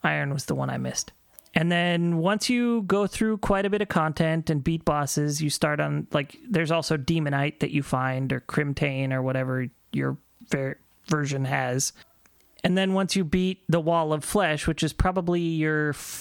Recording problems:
squashed, flat; somewhat

